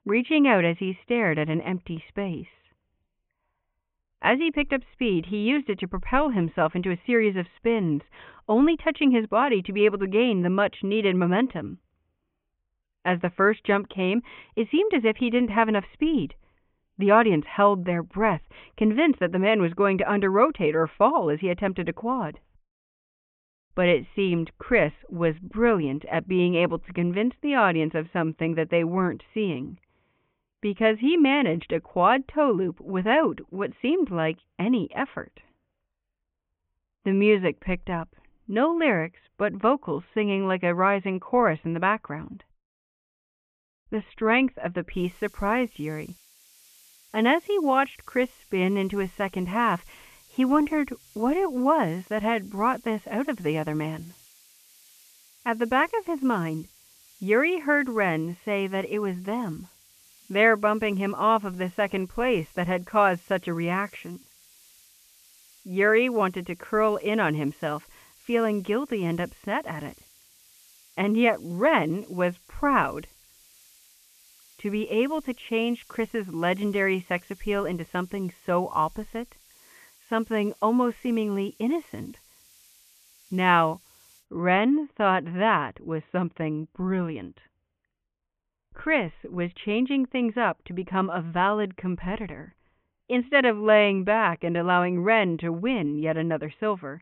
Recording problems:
high frequencies cut off; severe; nothing above 3.5 kHz
hiss; faint; from 45 s to 1:24; 30 dB below the speech

